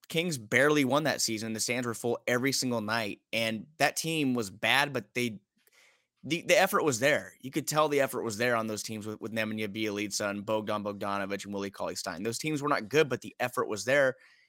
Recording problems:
none

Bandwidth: 16 kHz